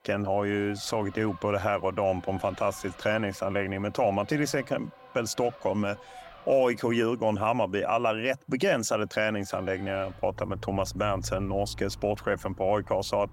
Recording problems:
traffic noise; noticeable; throughout; 20 dB below the speech

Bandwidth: 16 kHz